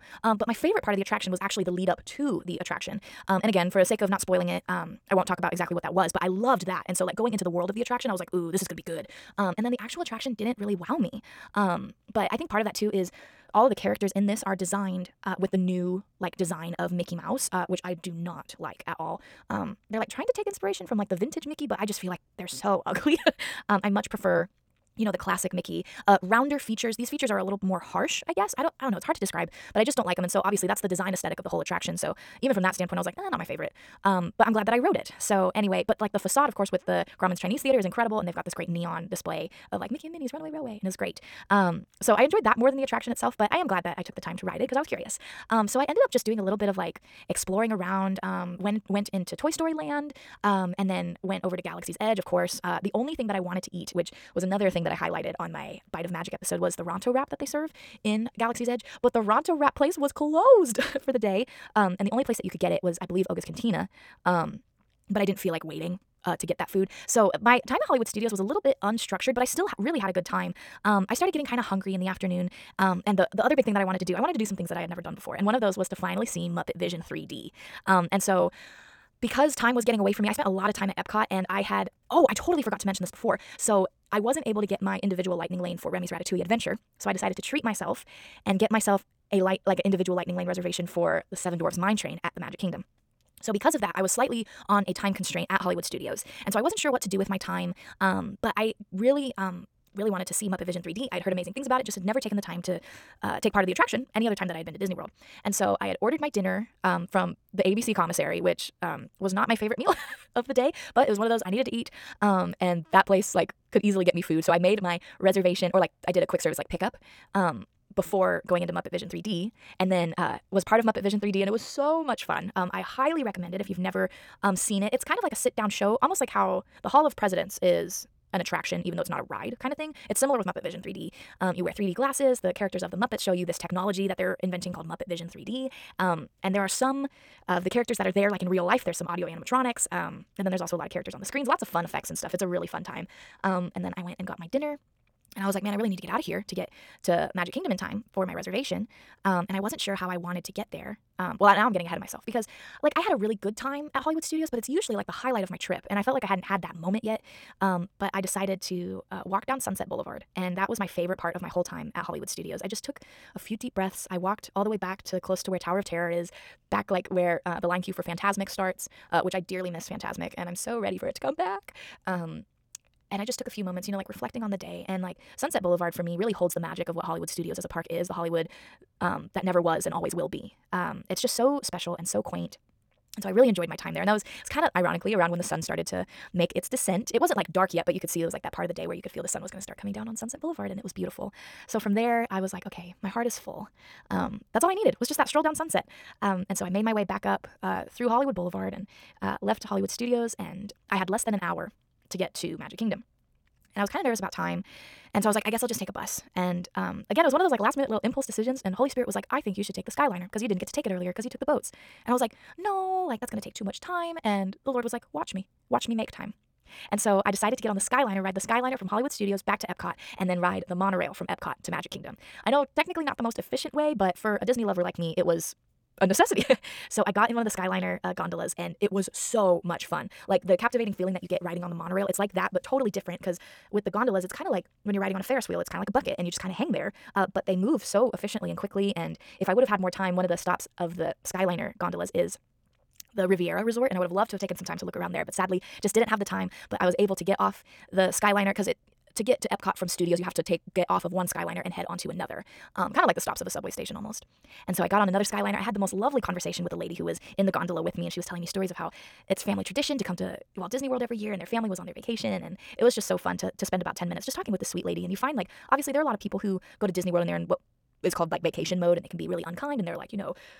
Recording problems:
wrong speed, natural pitch; too fast; 1.7 times normal speed

